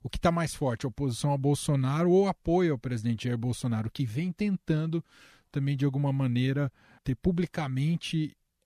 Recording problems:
none

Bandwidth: 15 kHz